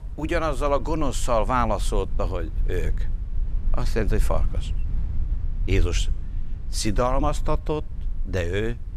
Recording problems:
low rumble; faint; throughout; 25 dB below the speech

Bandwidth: 14.5 kHz